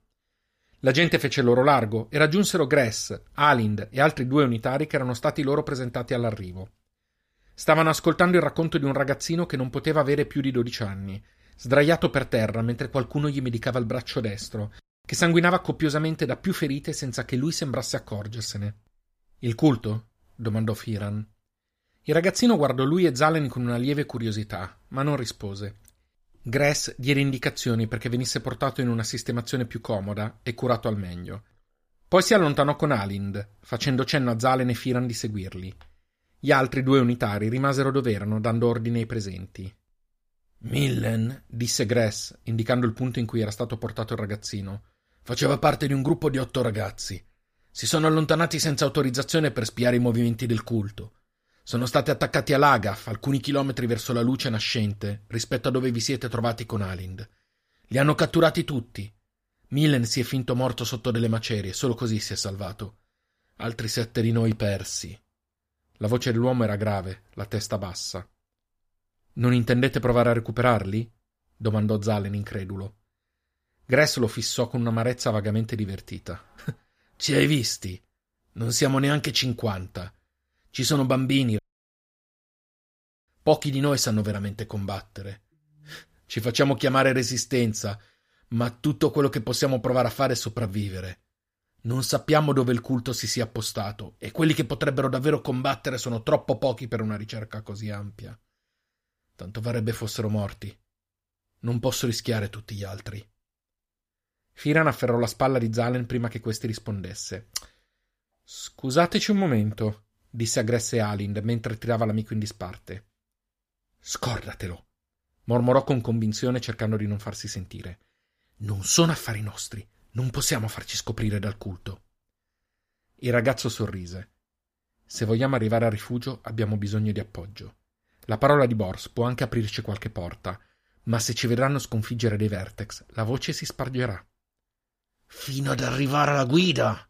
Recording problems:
audio cutting out; at 1:22 for 1.5 s

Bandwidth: 15 kHz